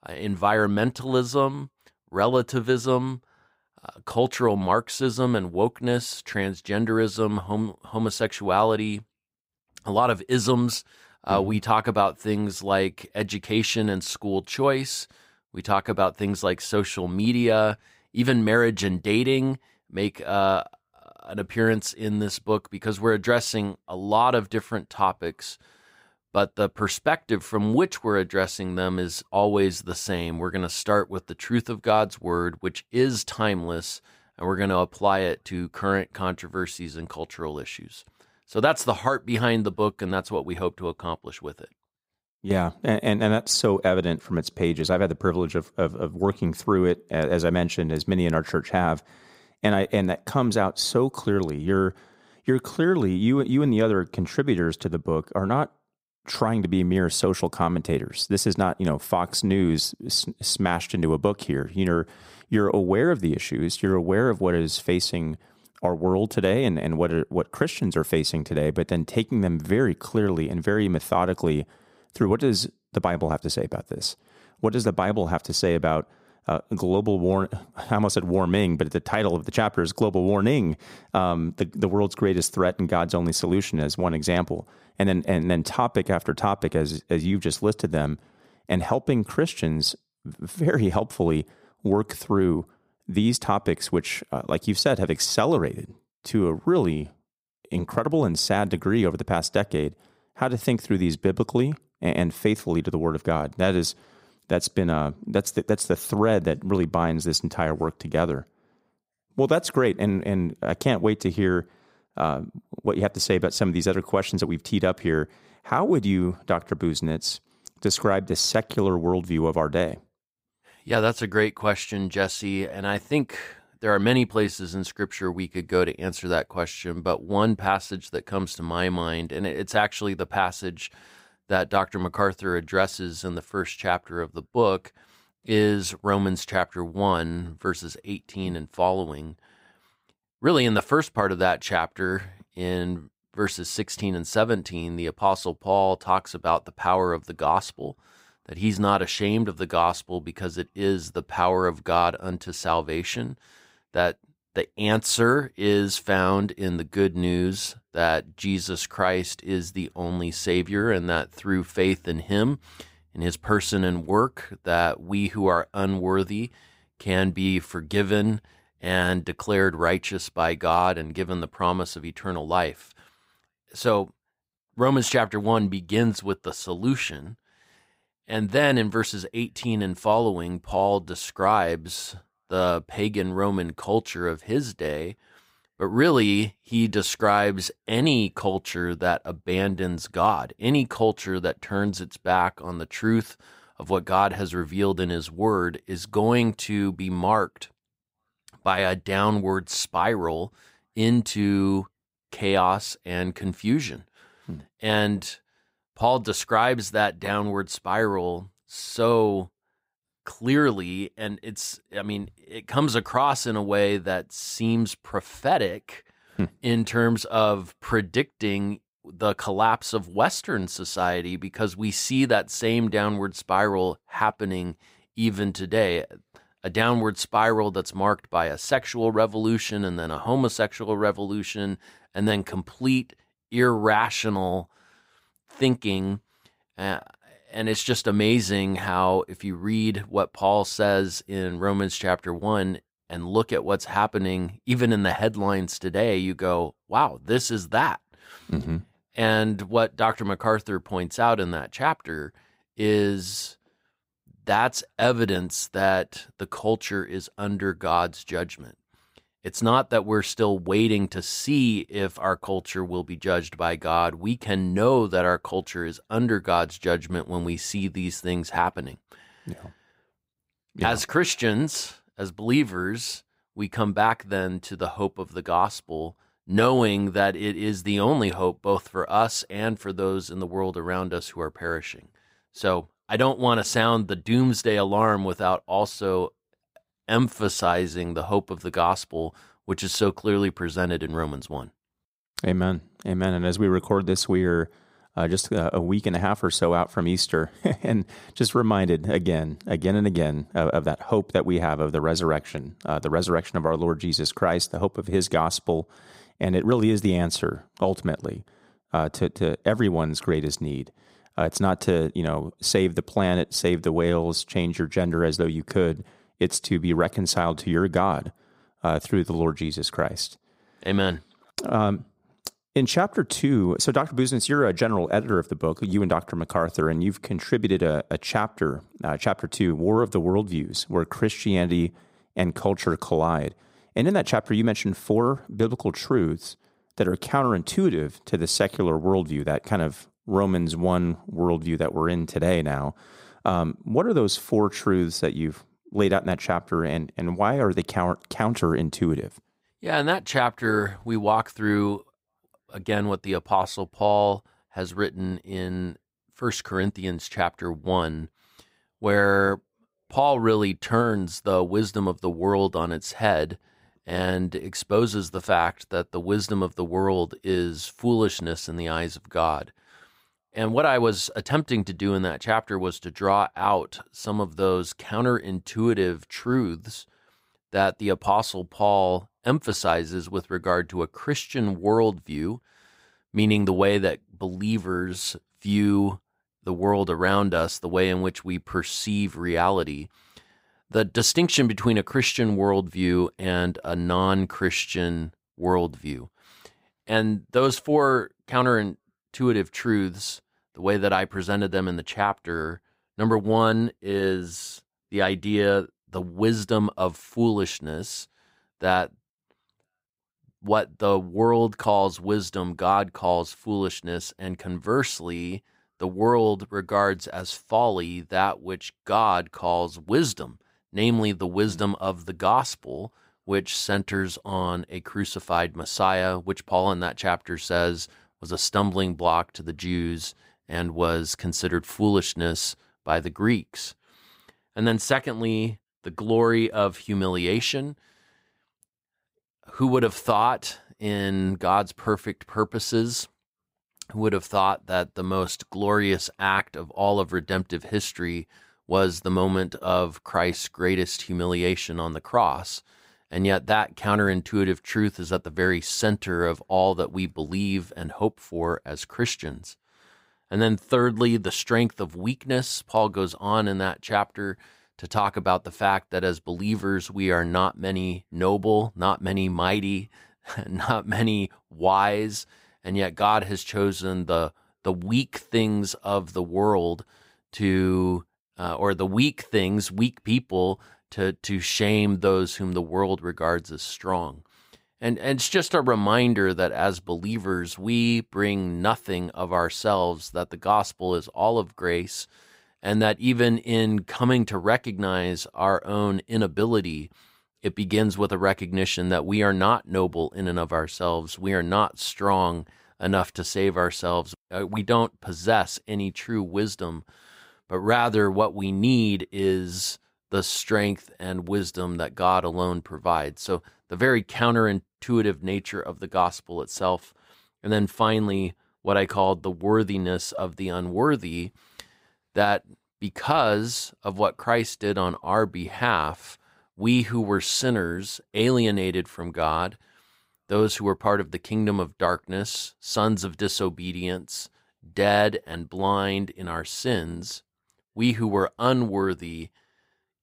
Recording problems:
none

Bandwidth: 15.5 kHz